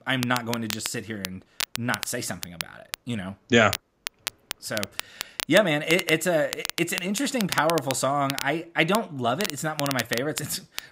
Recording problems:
crackle, like an old record; loud; 8 dB below the speech

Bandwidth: 15.5 kHz